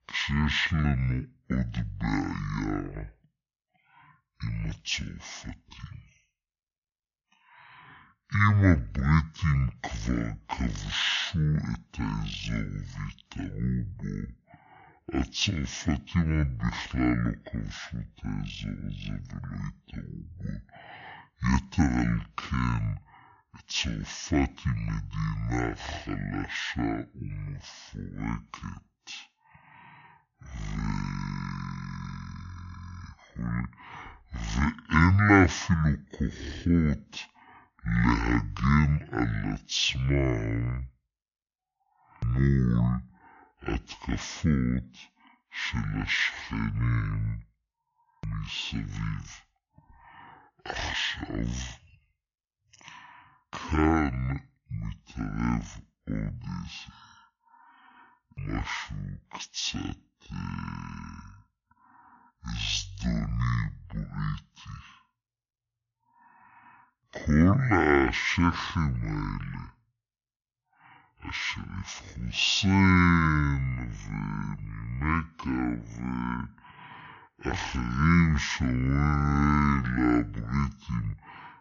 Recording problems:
wrong speed and pitch; too slow and too low; 0.5 times normal speed

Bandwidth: 7 kHz